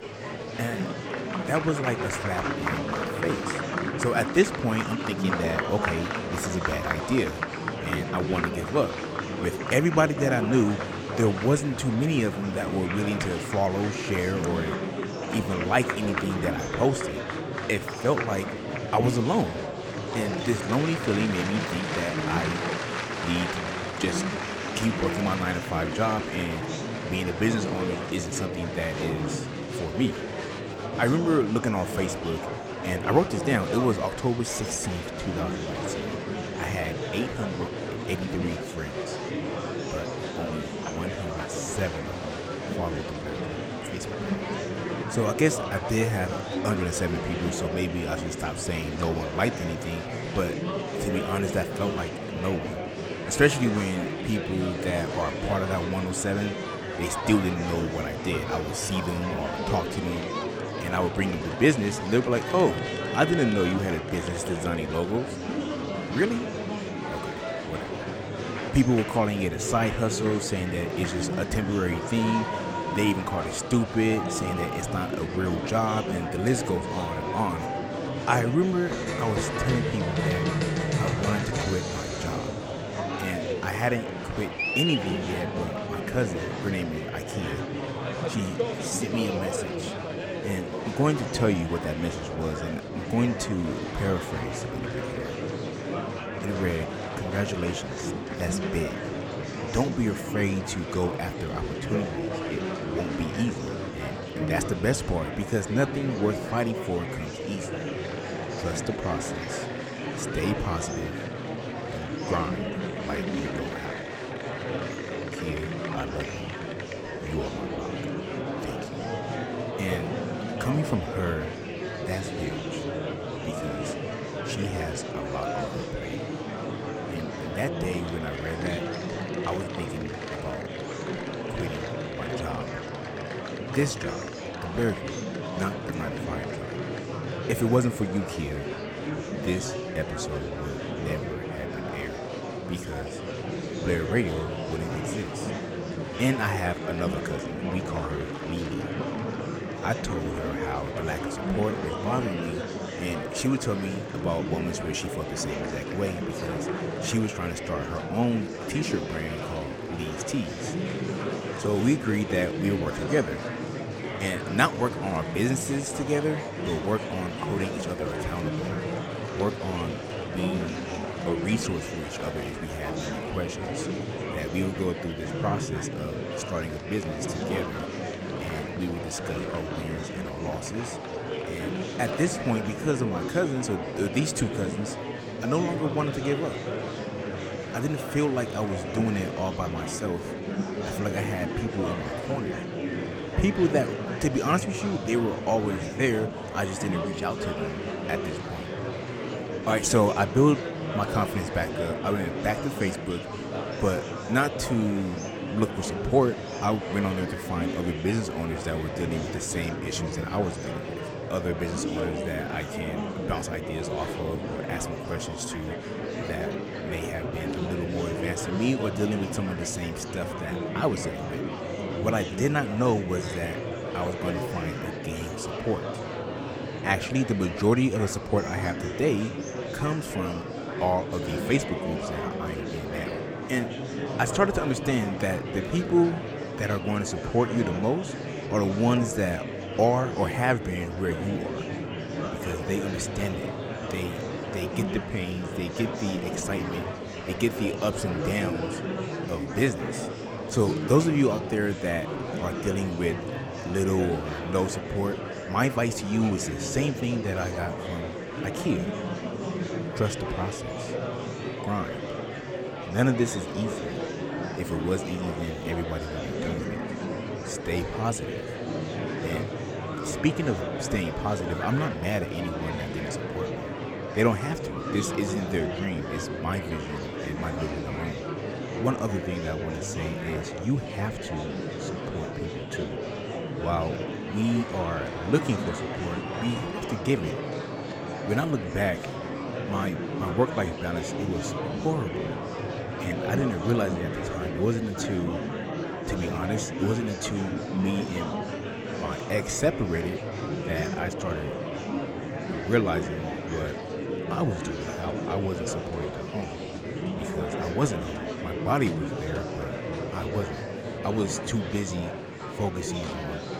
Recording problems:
murmuring crowd; loud; throughout; 3 dB below the speech

